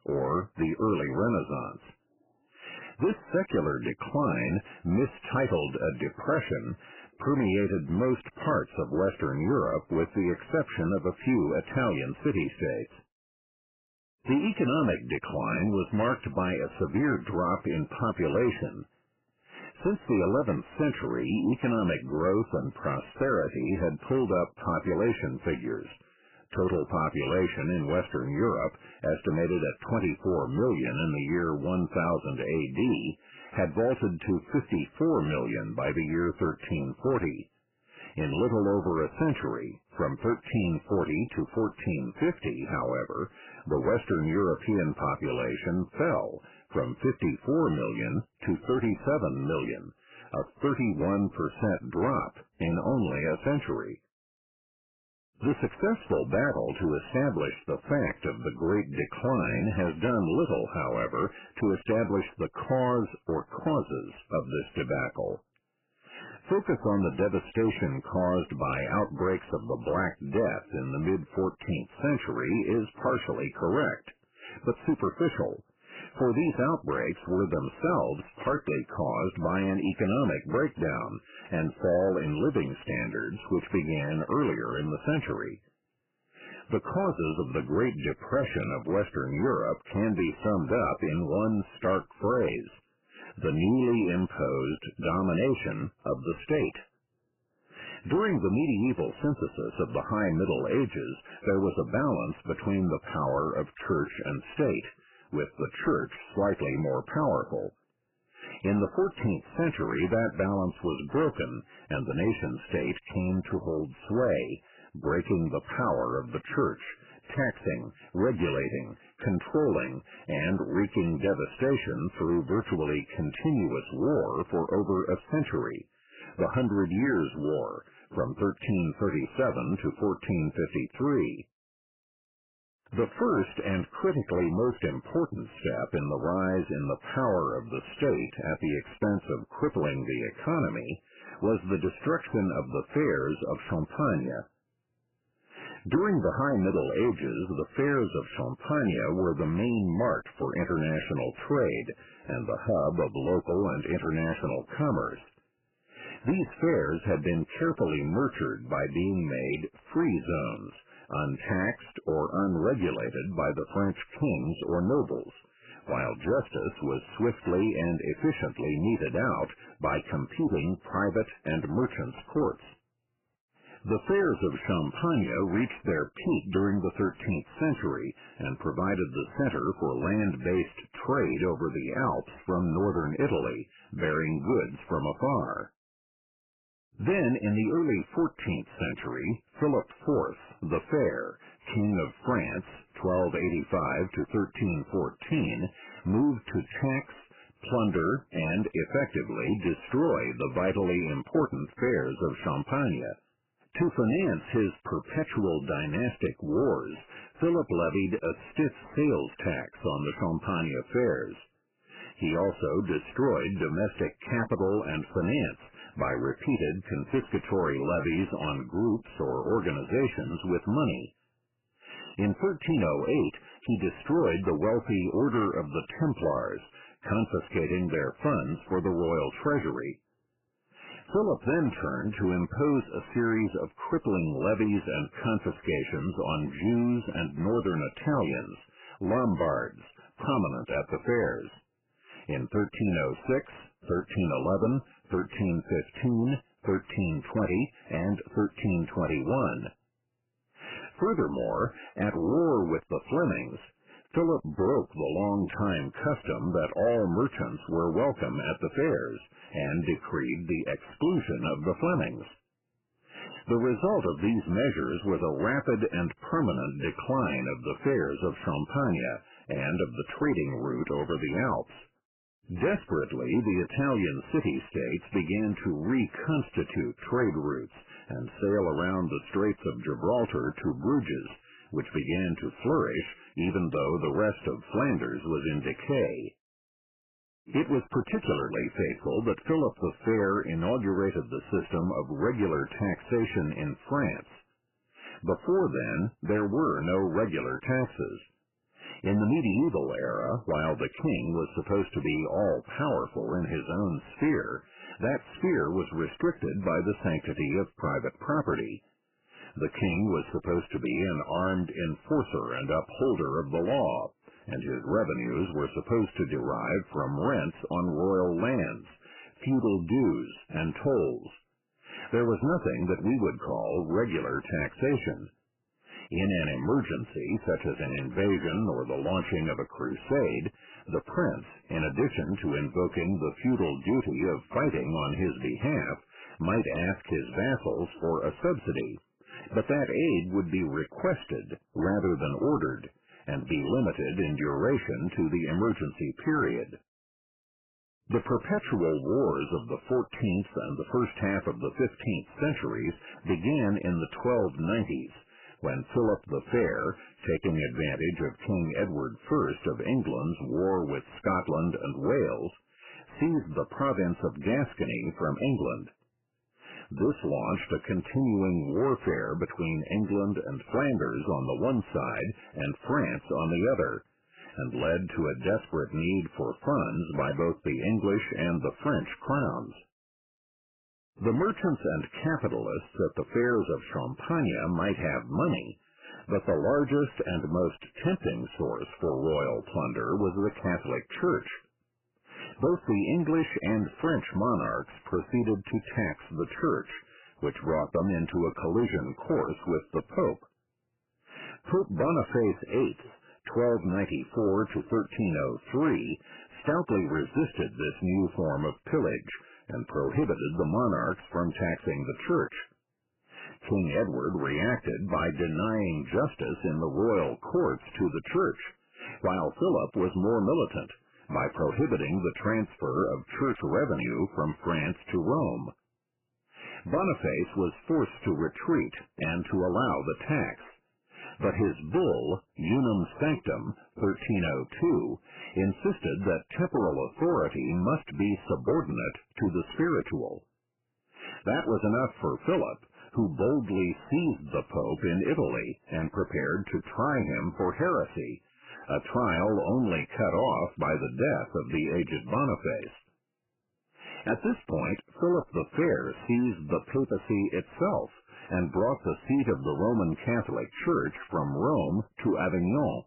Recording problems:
garbled, watery; badly; nothing above 3 kHz
distortion; slight; 10 dB below the speech

